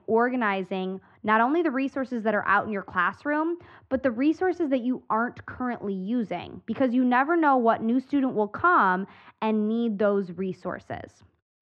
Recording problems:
muffled; very; fading above 1.5 kHz

